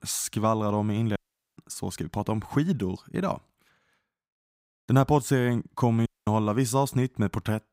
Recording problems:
audio cutting out; at 1 s and at 6 s

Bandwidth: 15.5 kHz